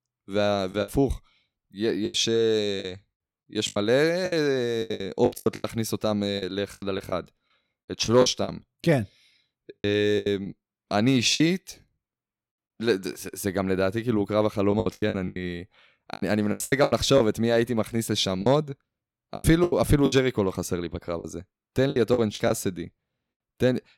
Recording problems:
choppy; very; 13% of the speech affected

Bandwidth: 16.5 kHz